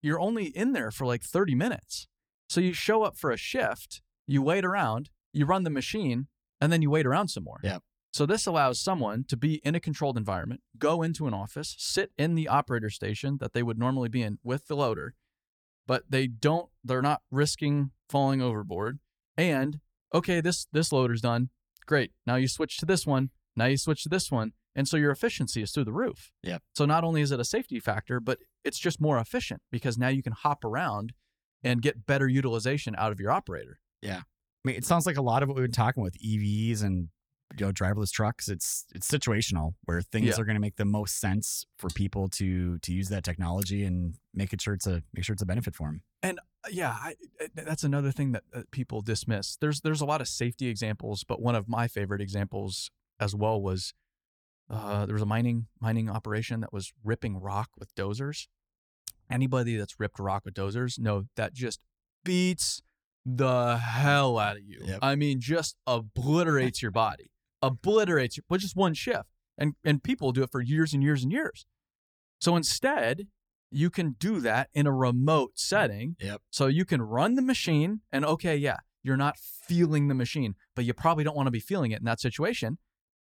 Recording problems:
none

